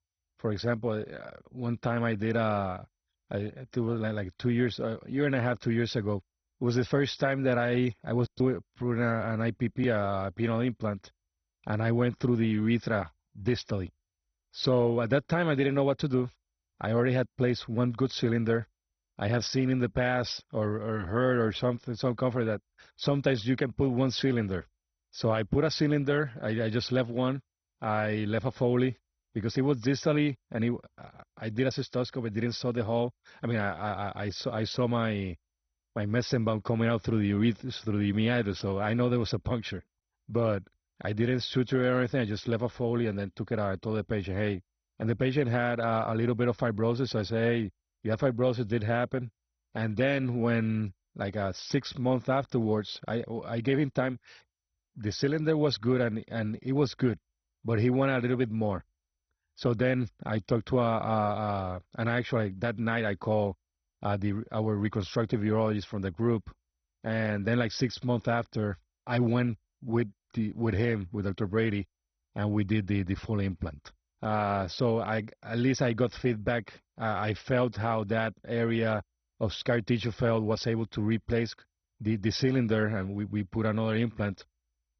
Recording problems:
garbled, watery; badly; nothing above 6 kHz

